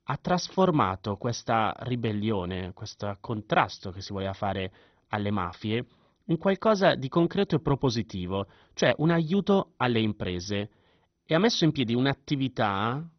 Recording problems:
garbled, watery; badly; nothing above 6 kHz

